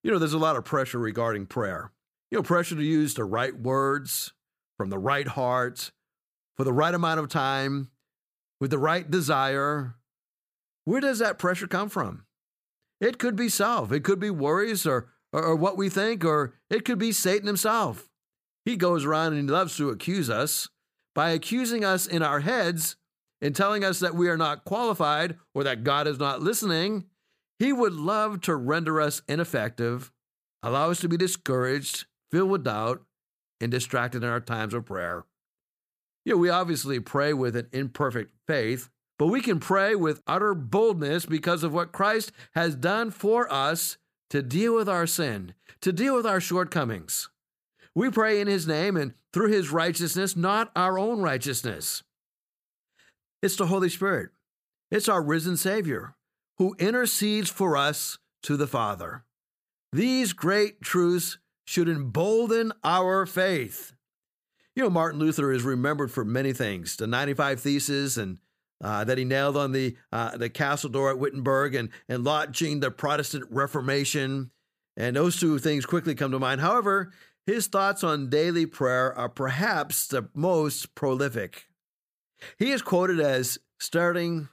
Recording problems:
none

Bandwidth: 15 kHz